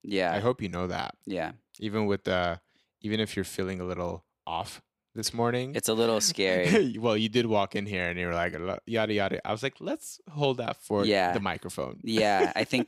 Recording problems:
none

